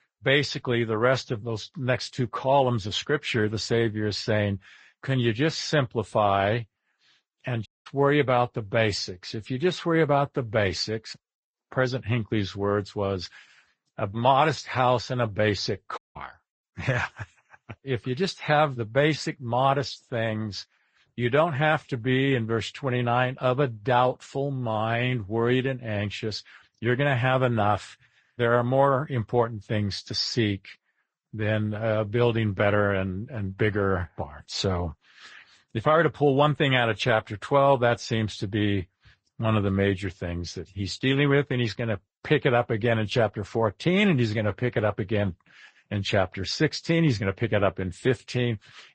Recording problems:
garbled, watery; slightly; nothing above 8 kHz
audio cutting out; at 7.5 s and at 16 s

